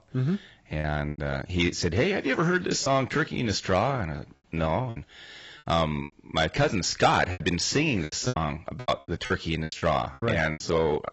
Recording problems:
garbled, watery; badly; nothing above 7.5 kHz
distortion; slight; 10 dB below the speech
choppy; very; from 1 to 3 s, at 5 s and from 7.5 to 11 s; 11% of the speech affected

